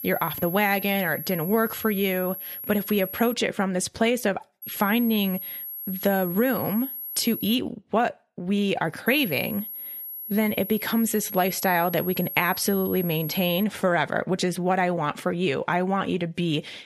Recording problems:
high-pitched whine; loud; until 3.5 s, from 4.5 to 7.5 s and from 9 to 14 s; 11.5 kHz, 8 dB below the speech

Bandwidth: 13.5 kHz